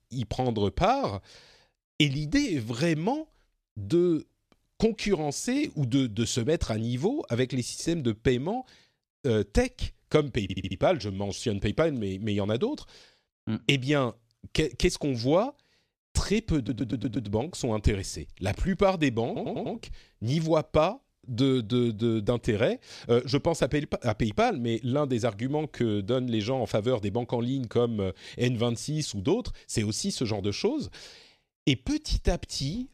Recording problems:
audio stuttering; at 10 s, at 17 s and at 19 s

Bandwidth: 14 kHz